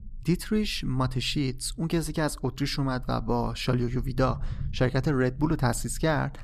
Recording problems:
low rumble; faint; throughout; 25 dB below the speech

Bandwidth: 14 kHz